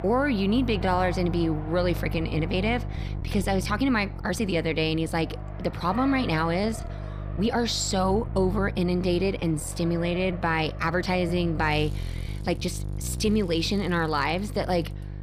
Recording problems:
electrical hum; noticeable; throughout; 50 Hz, 20 dB below the speech
traffic noise; noticeable; throughout; 20 dB below the speech
uneven, jittery; strongly; from 1 to 13 s

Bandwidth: 15 kHz